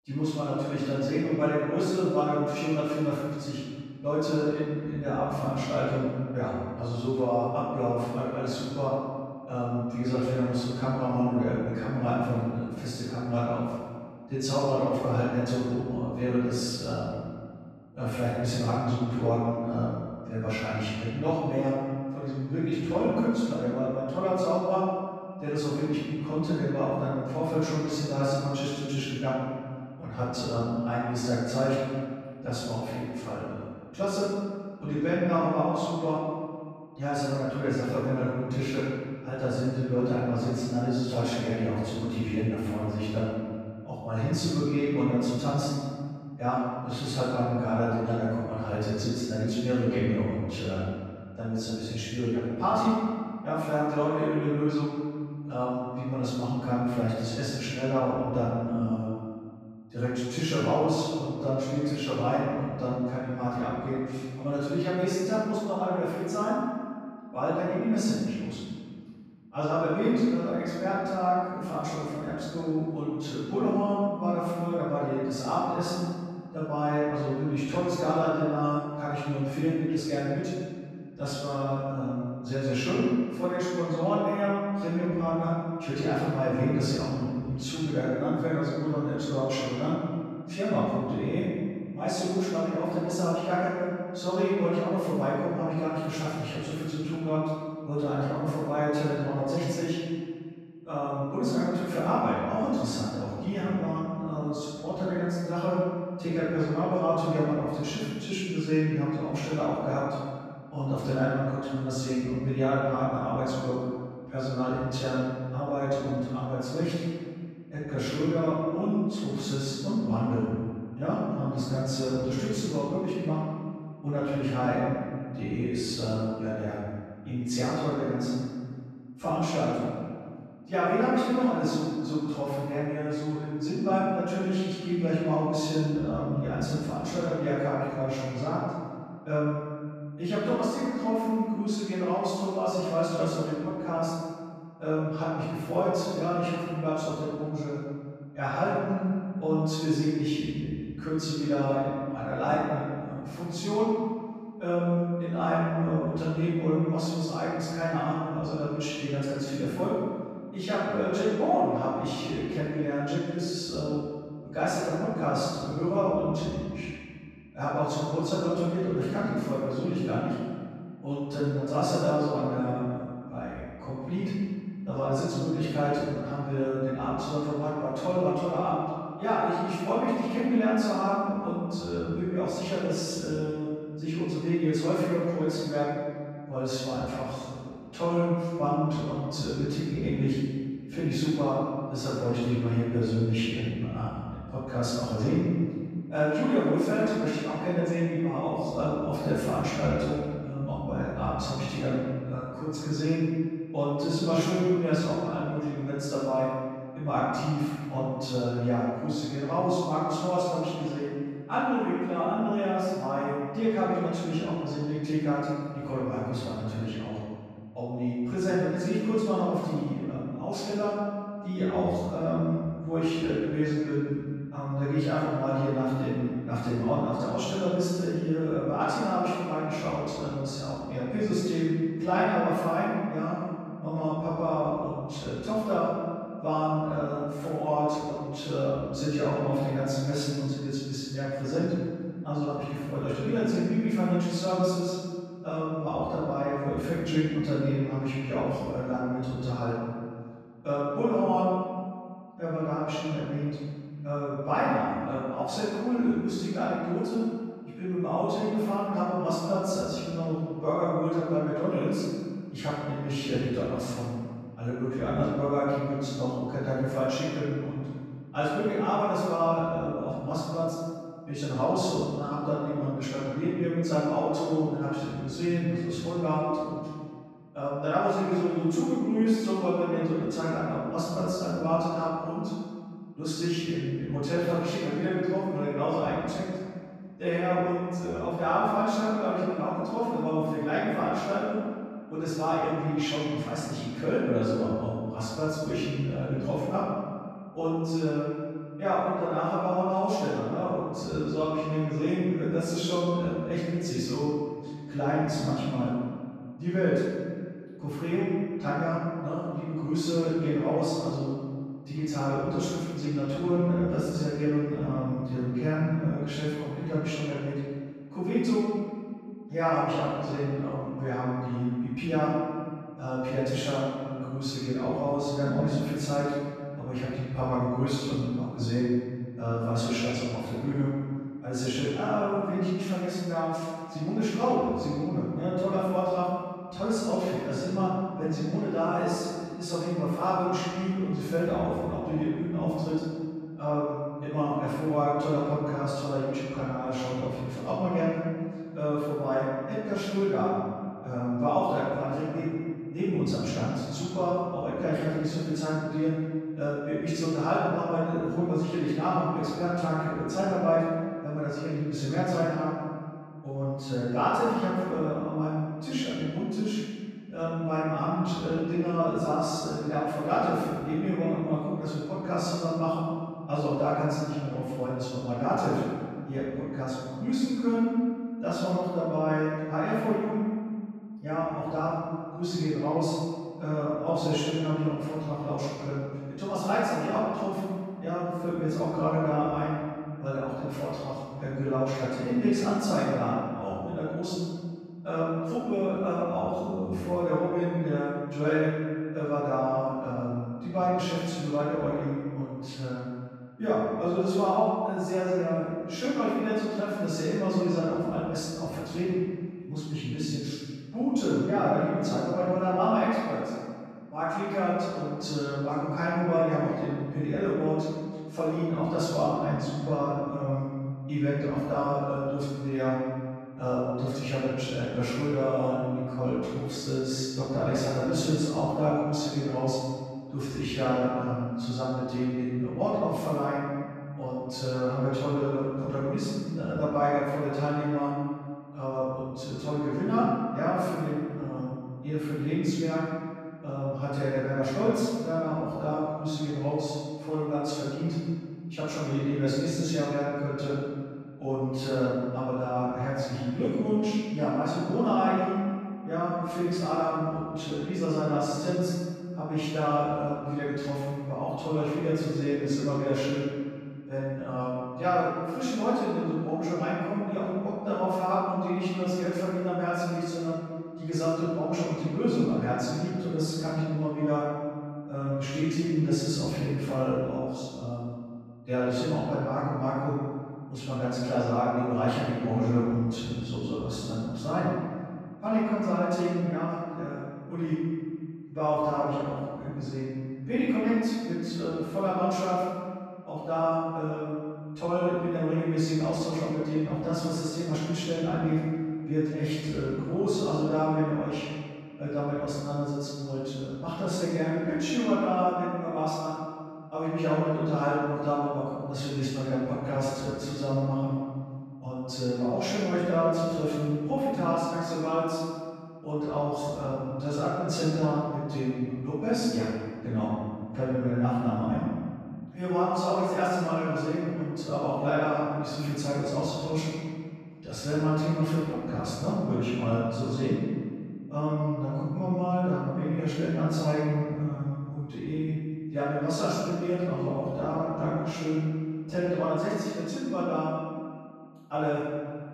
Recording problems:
room echo; strong; dies away in 1.8 s
off-mic speech; far

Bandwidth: 14.5 kHz